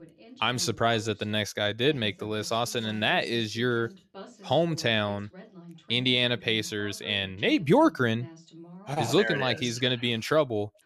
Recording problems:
voice in the background; faint; throughout; 20 dB below the speech

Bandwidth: 13.5 kHz